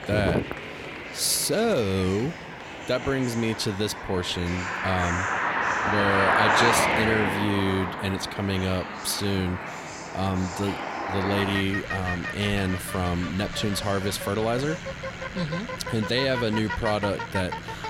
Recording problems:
traffic noise; loud; throughout; 2 dB below the speech
murmuring crowd; noticeable; throughout; 15 dB below the speech

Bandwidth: 16 kHz